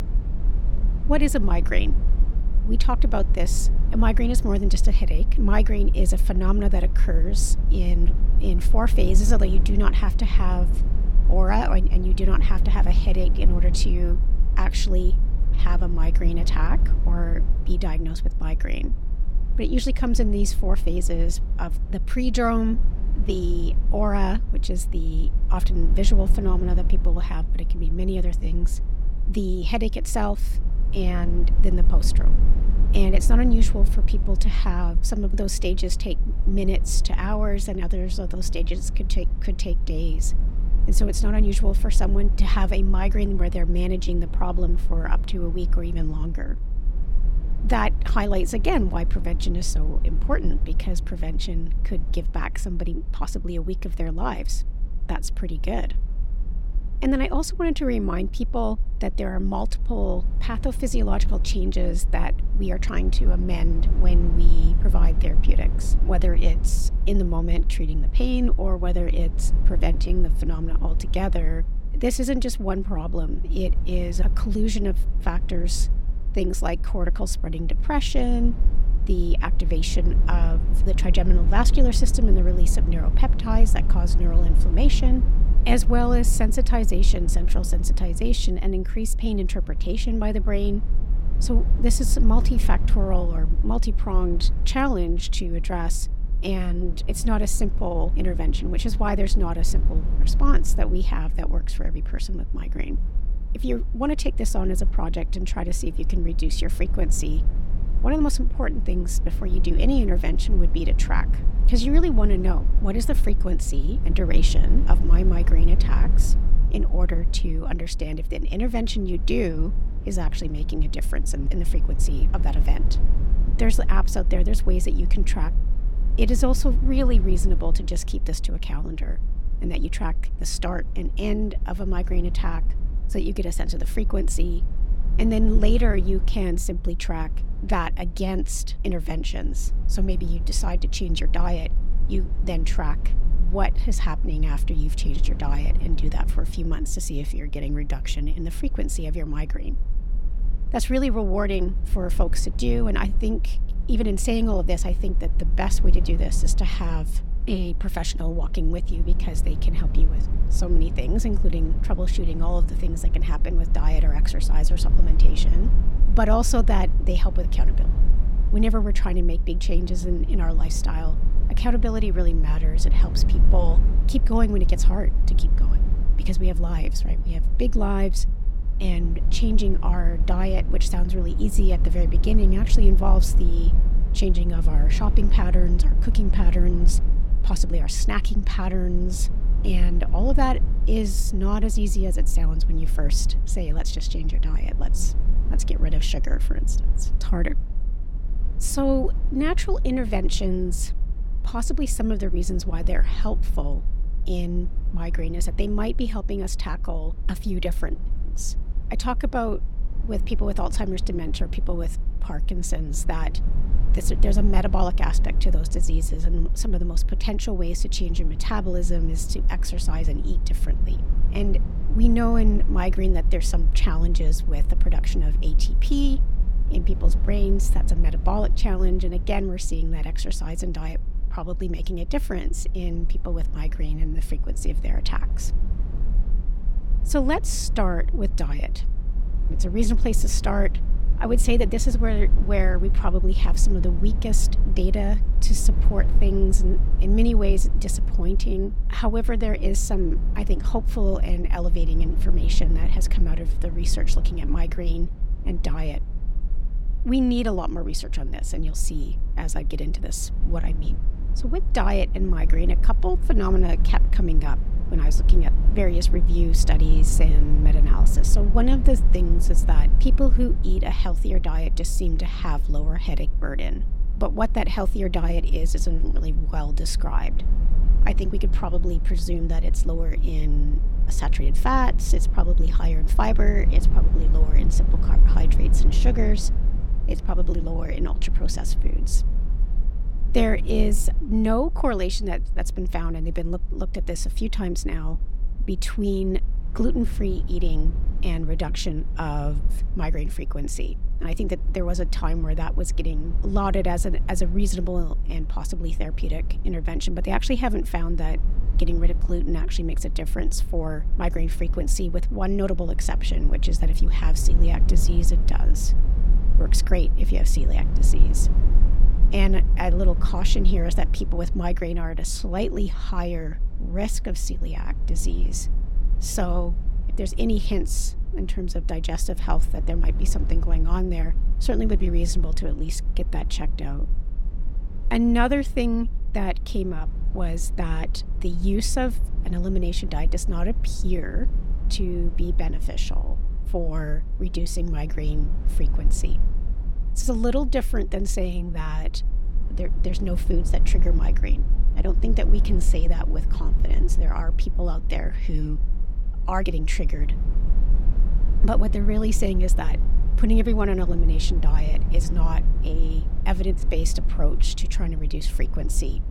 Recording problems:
low rumble; noticeable; throughout; 15 dB below the speech

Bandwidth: 17 kHz